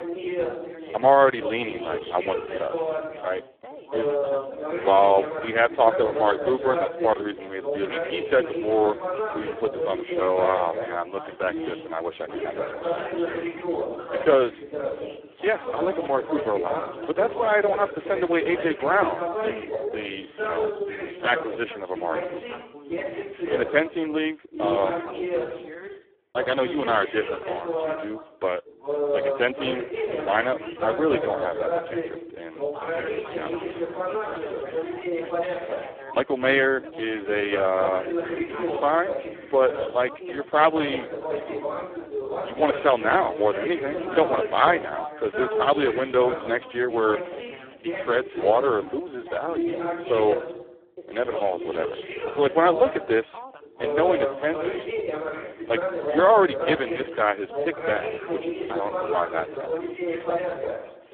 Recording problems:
phone-call audio; poor line
background chatter; loud; throughout; 3 voices, 5 dB below the speech

